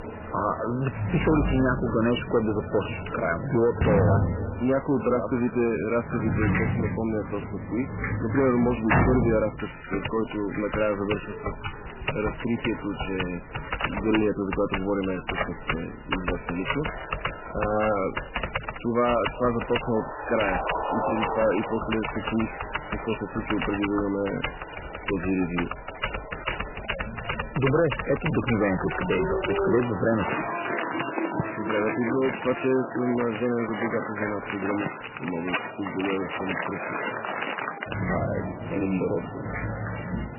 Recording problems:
garbled, watery; badly; nothing above 3 kHz
distortion; slight; 9 dB below the speech
crowd noise; loud; throughout; 9 dB below the speech
household noises; loud; throughout; 4 dB below the speech

